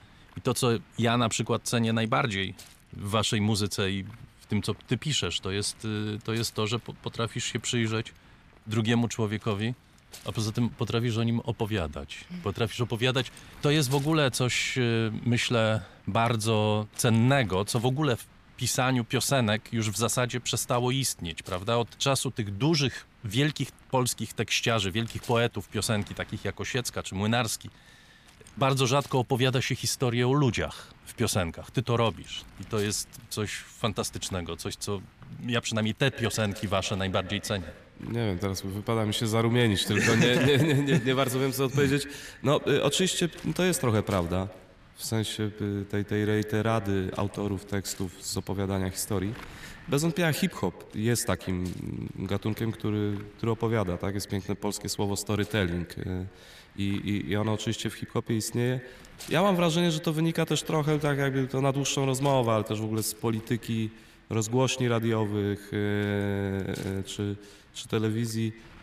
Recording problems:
echo of what is said; noticeable; from 36 s on; 110 ms later, 15 dB below the speech
wind noise on the microphone; occasional gusts; 25 dB below the speech

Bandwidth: 14.5 kHz